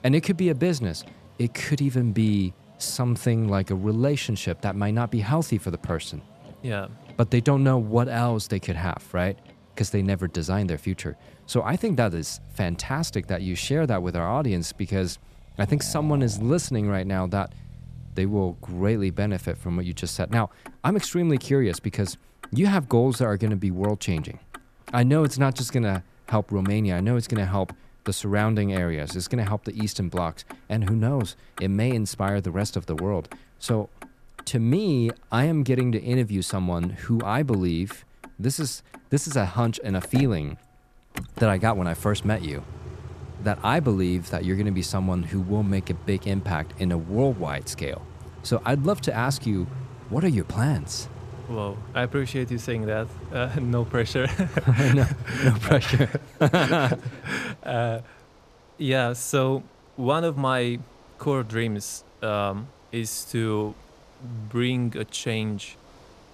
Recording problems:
traffic noise; noticeable; throughout; 20 dB below the speech

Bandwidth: 14.5 kHz